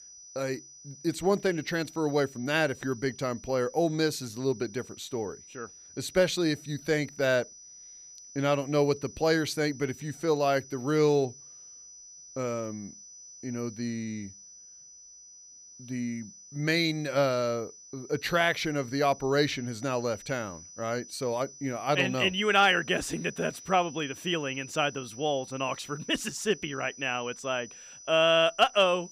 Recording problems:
high-pitched whine; noticeable; throughout; 6 kHz, 20 dB below the speech

